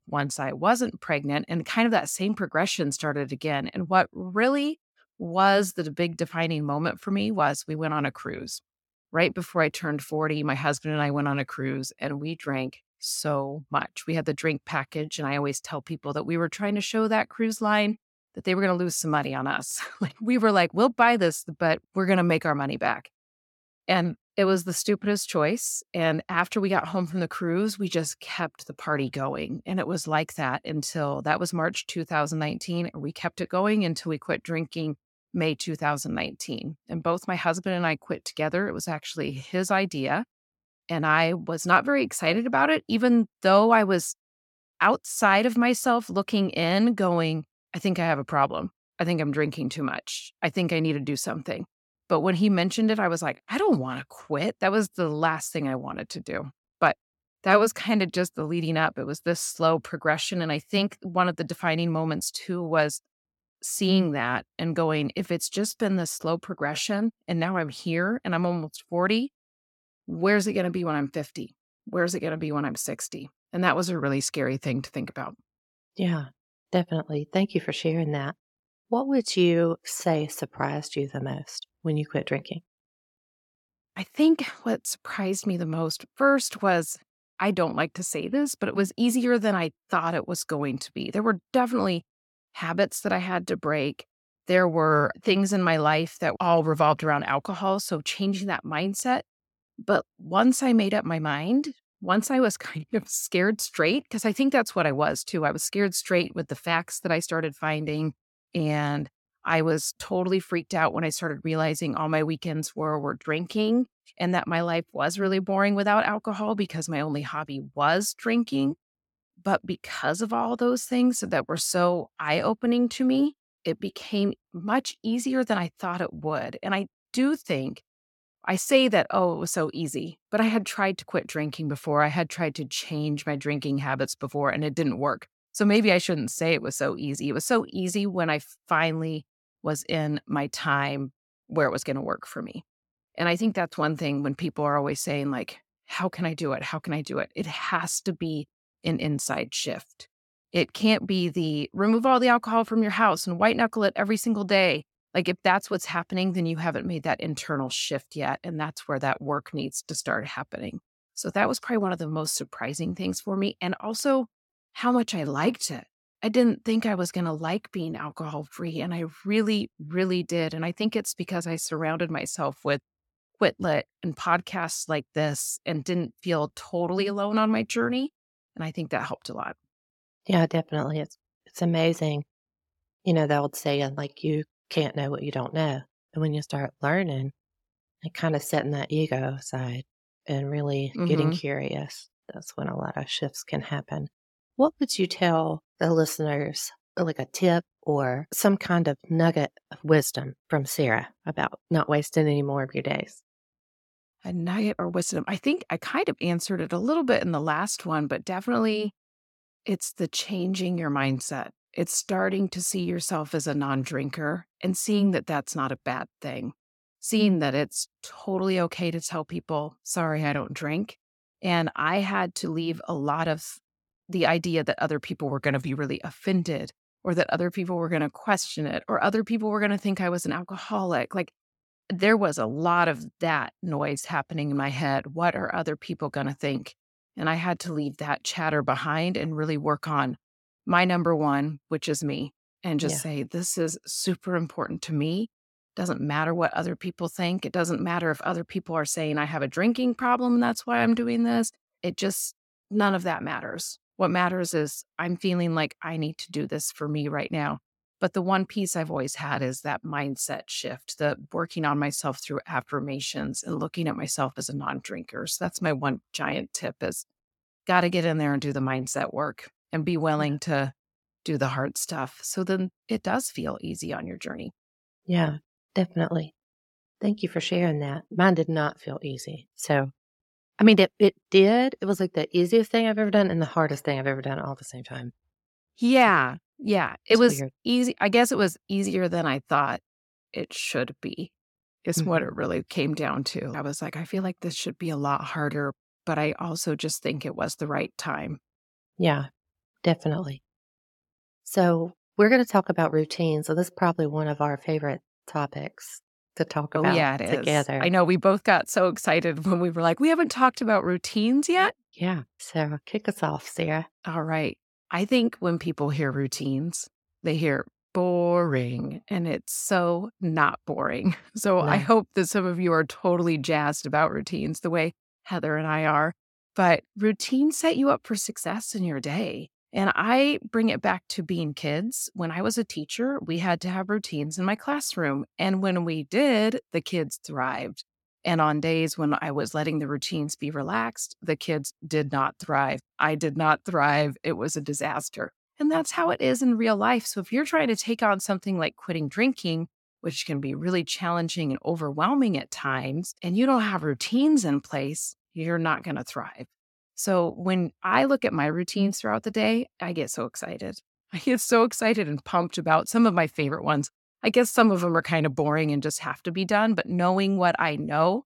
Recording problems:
none

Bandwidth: 17 kHz